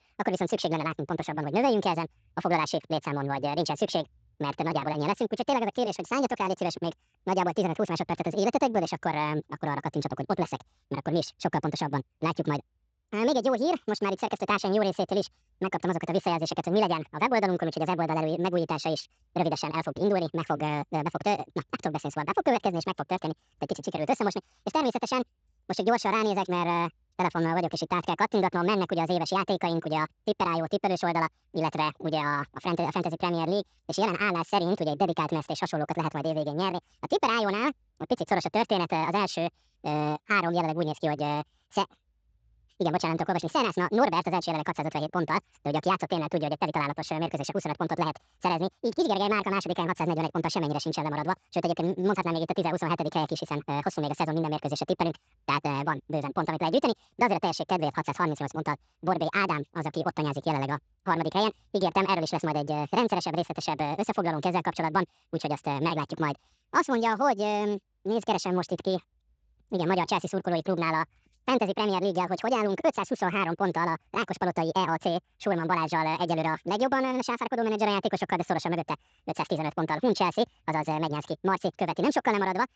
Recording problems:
wrong speed and pitch; too fast and too high; 1.7 times normal speed
garbled, watery; slightly; nothing above 7.5 kHz

